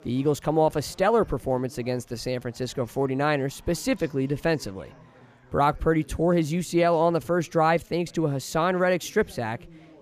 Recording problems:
chatter from many people; faint; throughout; 25 dB below the speech

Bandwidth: 15 kHz